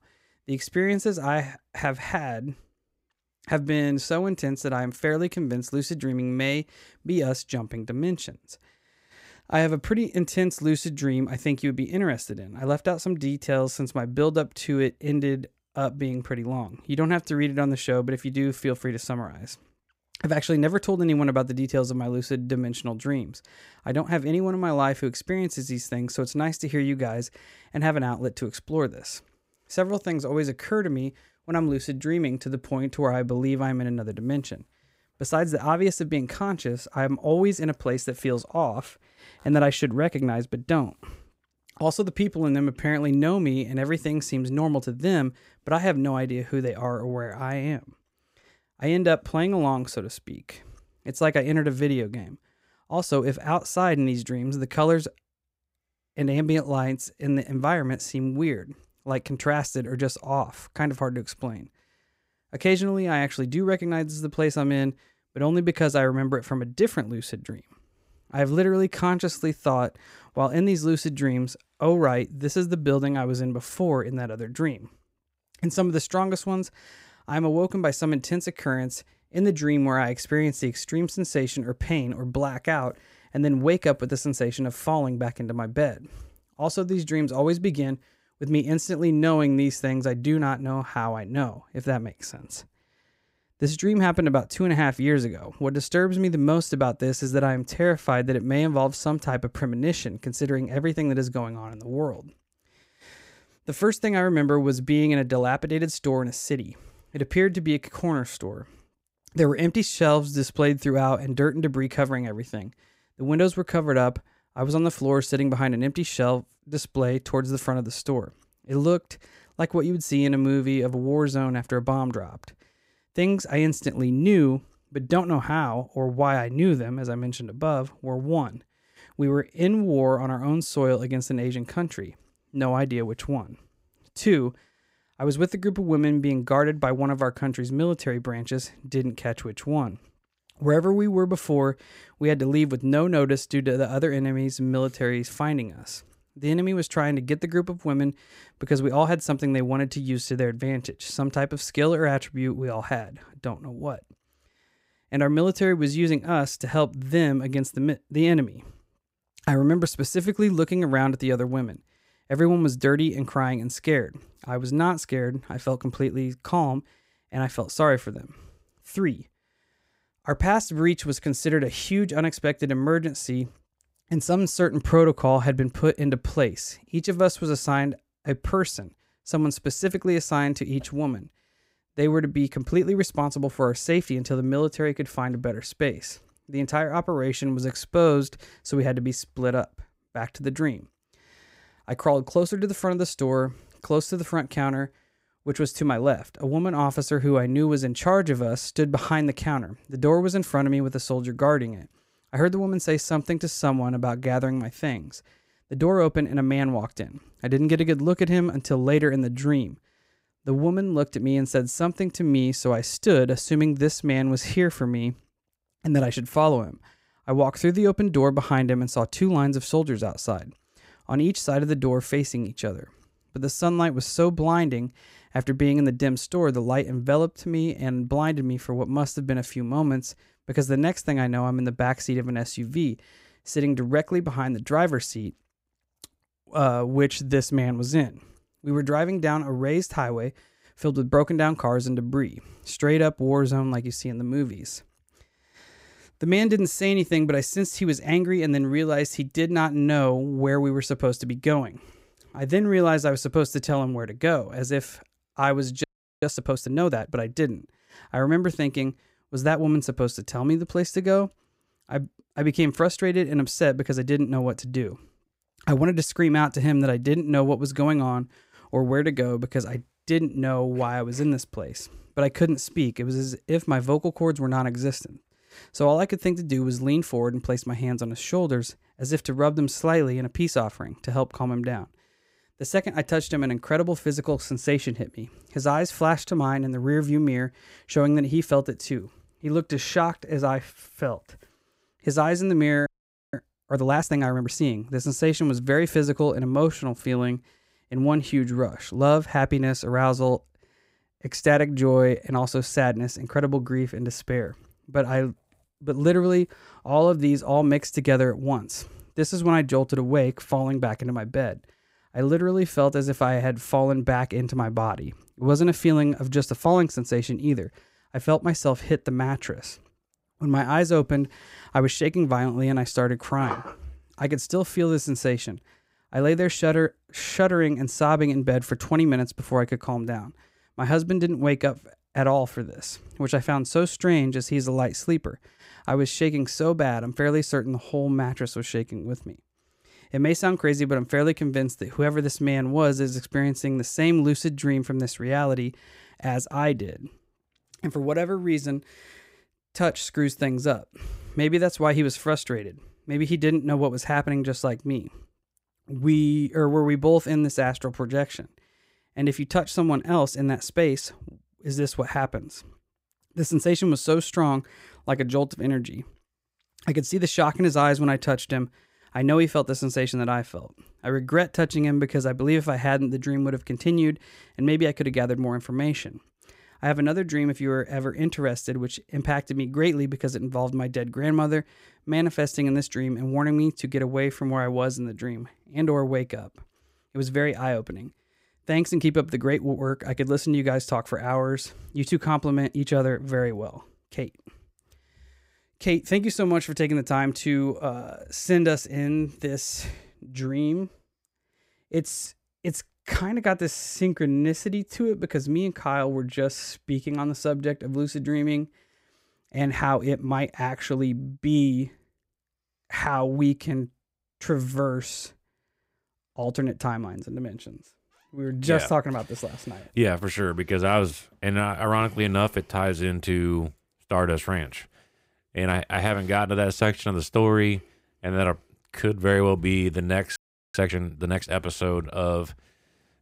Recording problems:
audio freezing; at 4:16, at 4:53 and at 7:10

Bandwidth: 15.5 kHz